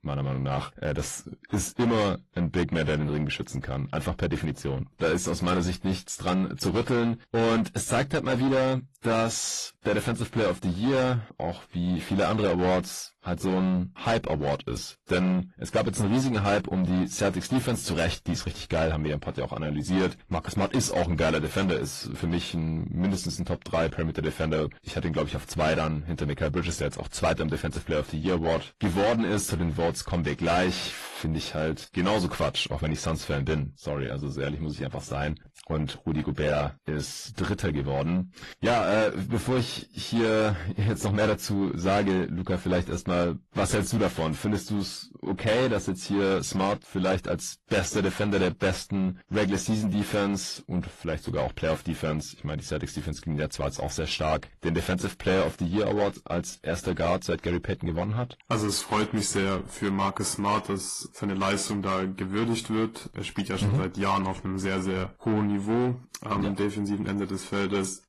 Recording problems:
distortion; heavy; 8 dB below the speech
garbled, watery; slightly; nothing above 11.5 kHz

